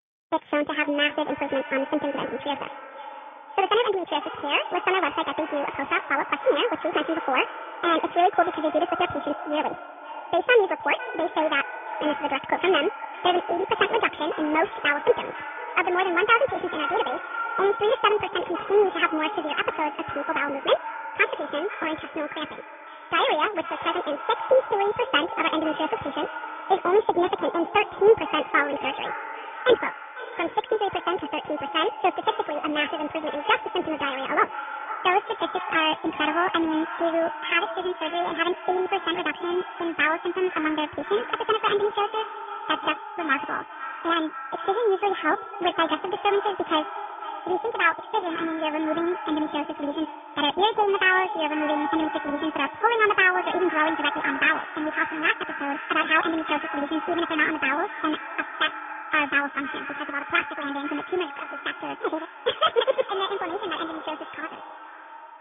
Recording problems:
echo of what is said; strong; throughout; 500 ms later, 10 dB below the speech
high frequencies cut off; severe; nothing above 3.5 kHz
wrong speed and pitch; too fast and too high; 1.7 times normal speed
garbled, watery; slightly

